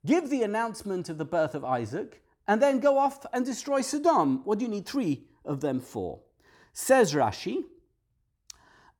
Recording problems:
none

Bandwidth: 18 kHz